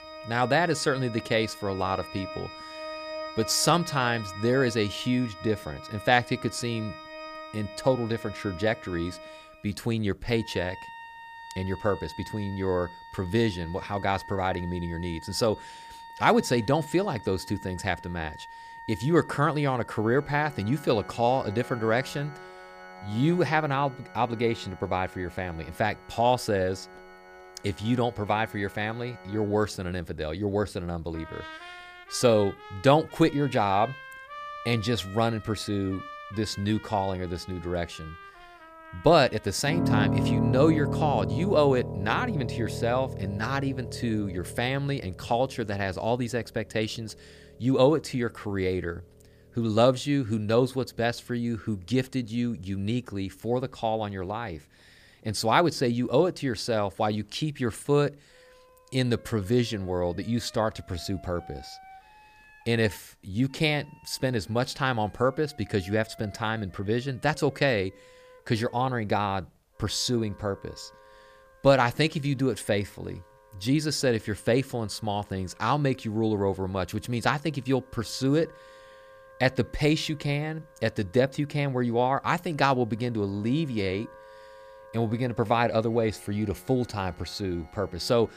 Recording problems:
background music; noticeable; throughout; 10 dB below the speech

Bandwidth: 15 kHz